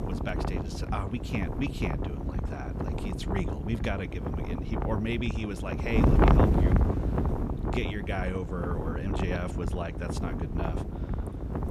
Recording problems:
wind noise on the microphone; heavy; 1 dB above the speech

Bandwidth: 13.5 kHz